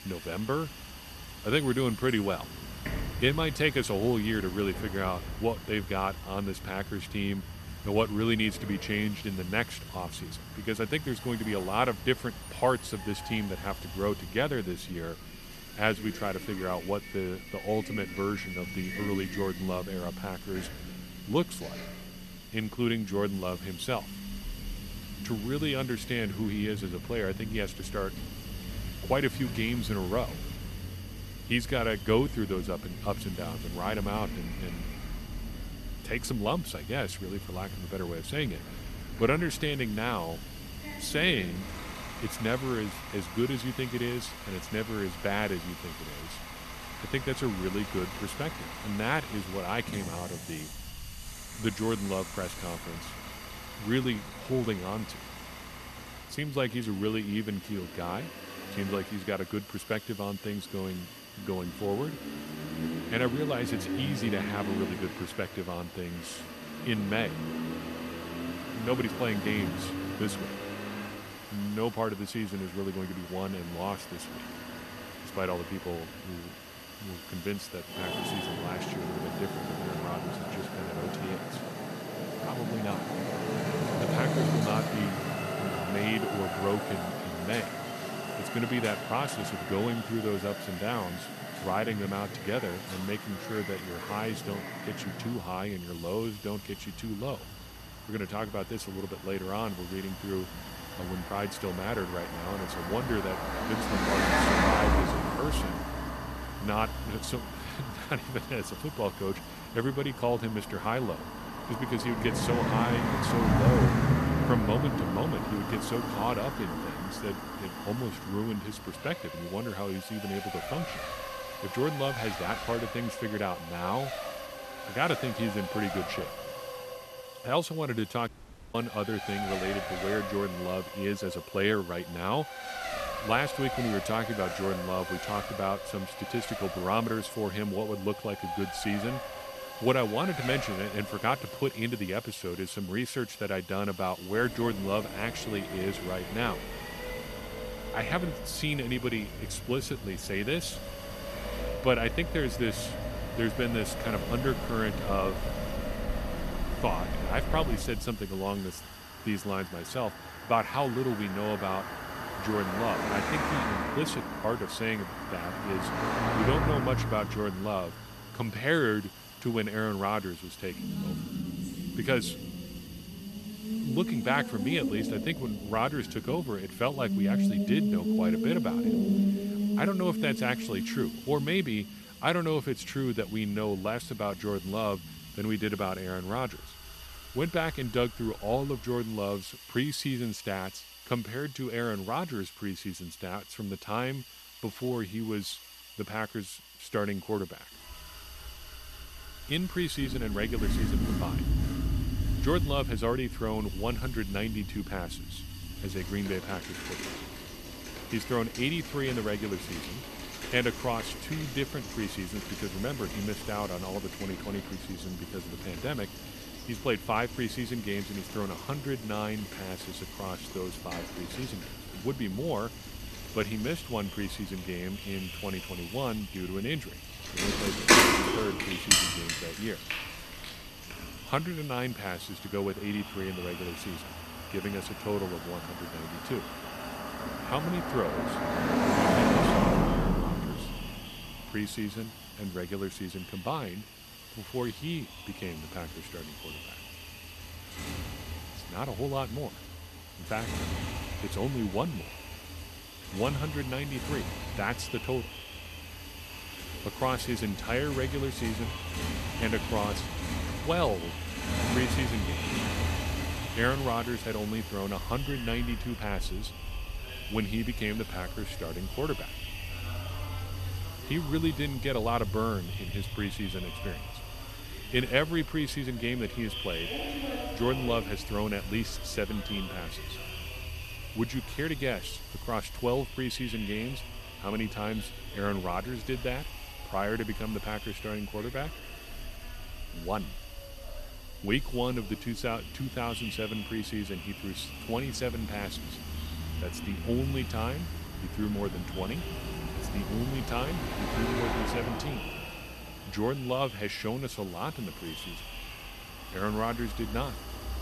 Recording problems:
echo of what is said; noticeable; from 3:43 on; 510 ms later, 15 dB below the speech
traffic noise; loud; throughout; 3 dB below the speech
hiss; noticeable; throughout; 15 dB below the speech
audio cutting out; at 2:08

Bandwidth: 13.5 kHz